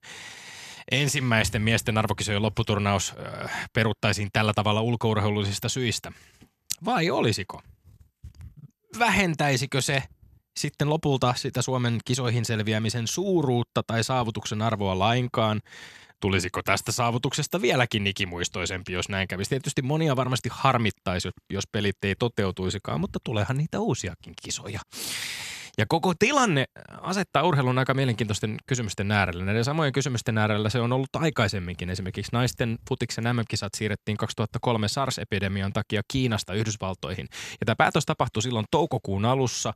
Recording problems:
none

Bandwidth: 14 kHz